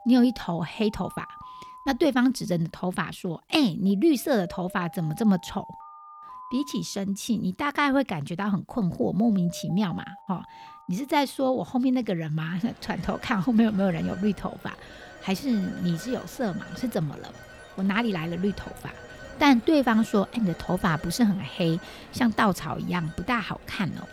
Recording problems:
alarms or sirens; noticeable; throughout; 20 dB below the speech

